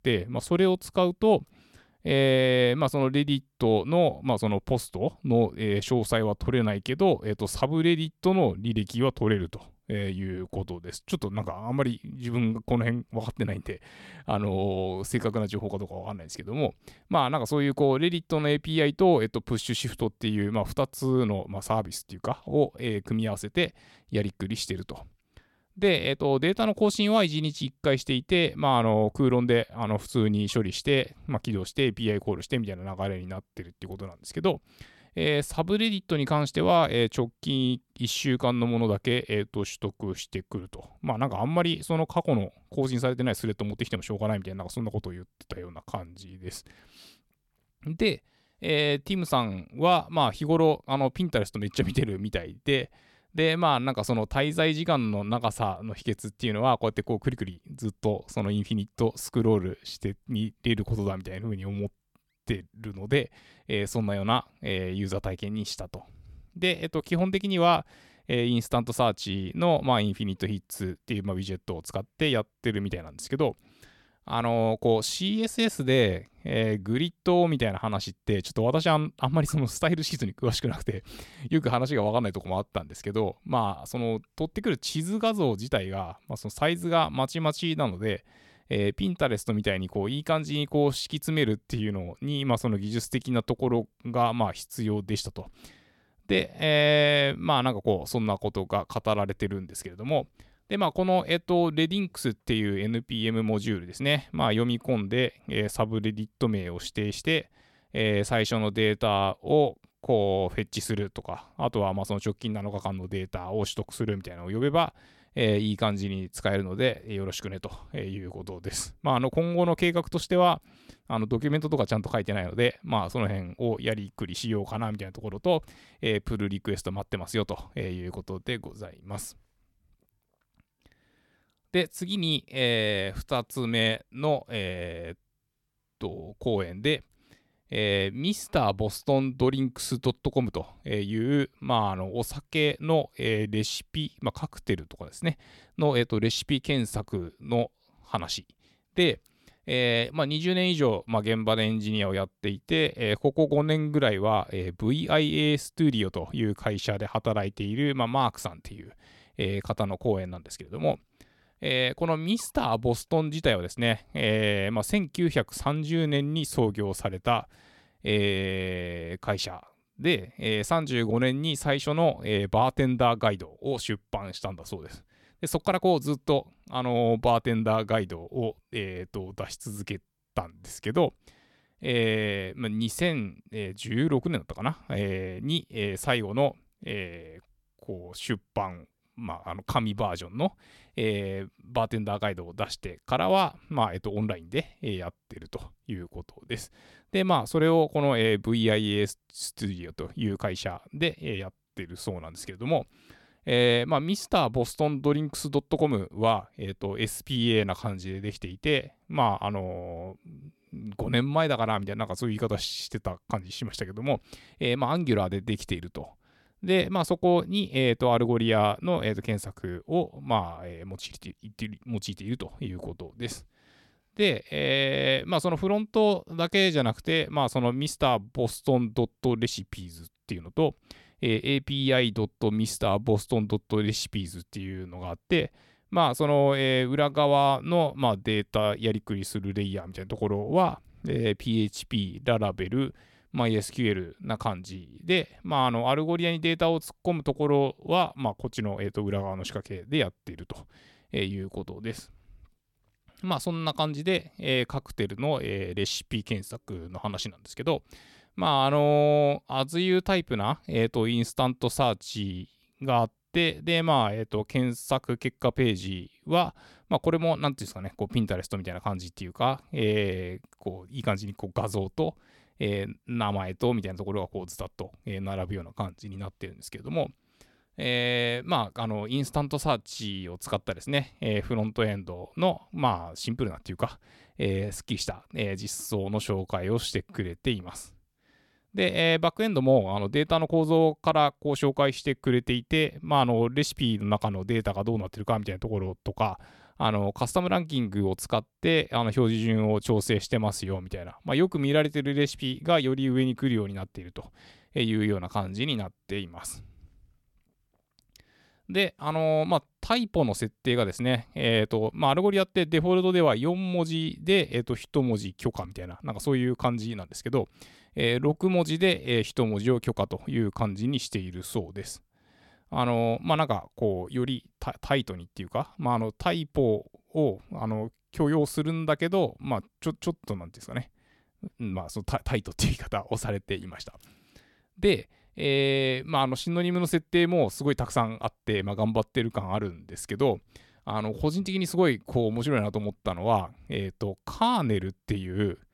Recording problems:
none

